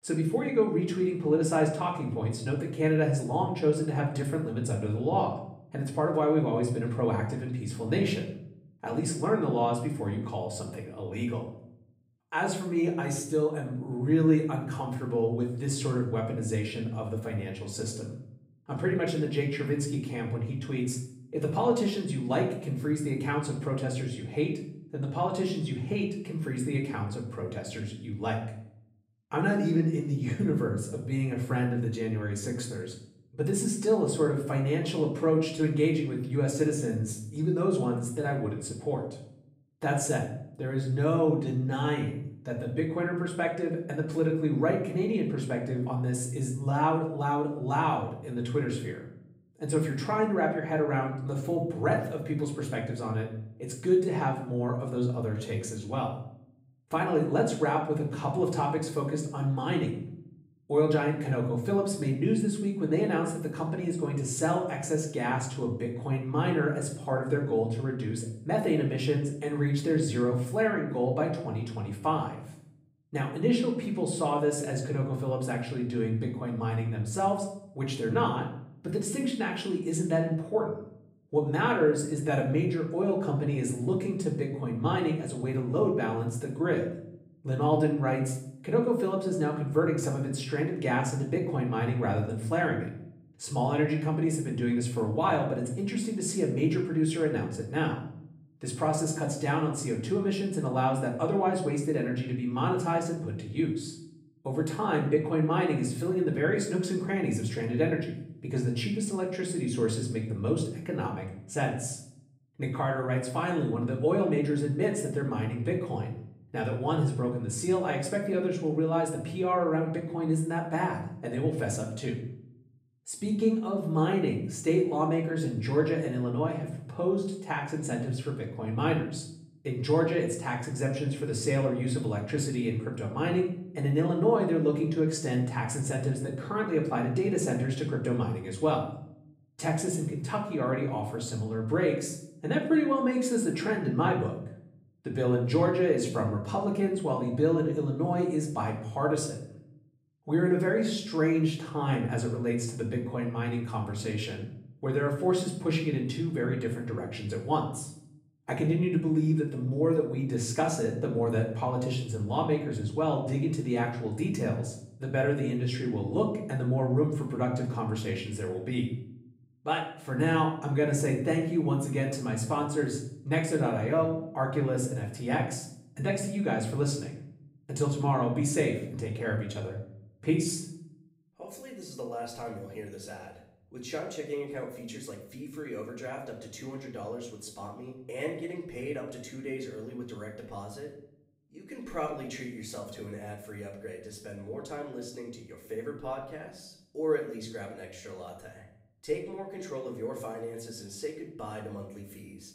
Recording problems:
off-mic speech; far
room echo; slight; dies away in 0.6 s

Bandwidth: 15.5 kHz